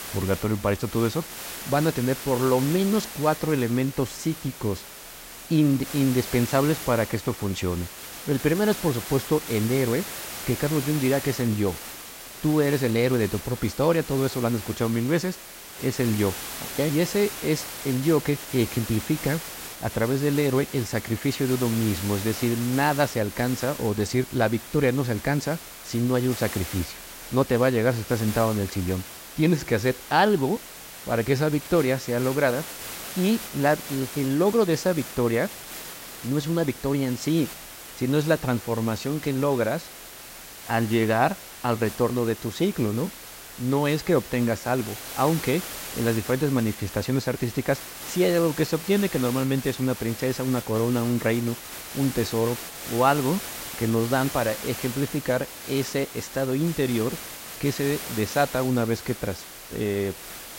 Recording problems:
hiss; noticeable; throughout; 10 dB below the speech

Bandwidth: 16 kHz